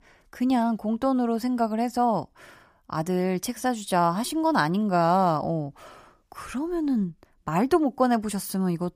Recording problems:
none

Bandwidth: 15 kHz